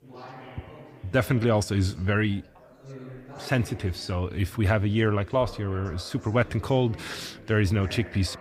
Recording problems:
background chatter; noticeable; throughout; 4 voices, 20 dB below the speech

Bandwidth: 15.5 kHz